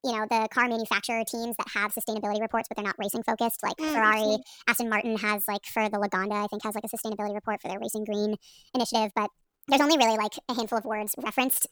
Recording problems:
wrong speed and pitch; too fast and too high; 1.5 times normal speed

